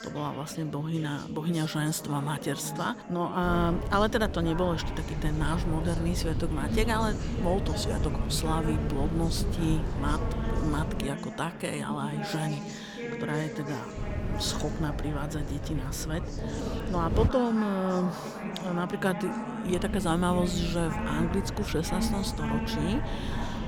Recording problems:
background chatter; loud; throughout; 4 voices, 6 dB below the speech
wind noise on the microphone; occasional gusts; from 3.5 to 11 s, from 14 to 17 s and from 20 s on; 10 dB below the speech

